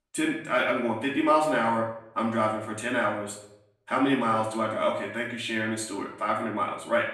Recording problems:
off-mic speech; far
room echo; slight; dies away in 0.6 s

